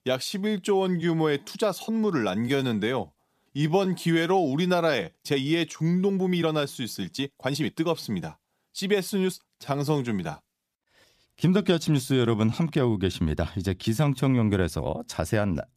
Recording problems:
uneven, jittery; strongly; from 1 to 15 s

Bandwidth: 14.5 kHz